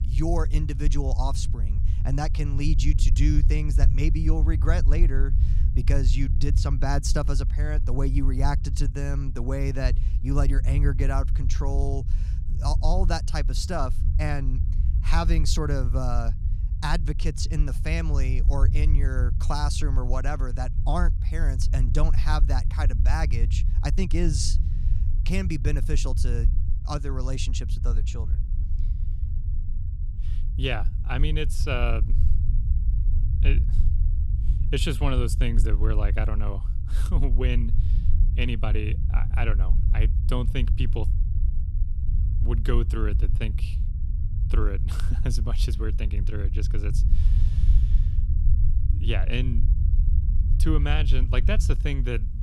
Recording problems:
low rumble; noticeable; throughout; 10 dB below the speech

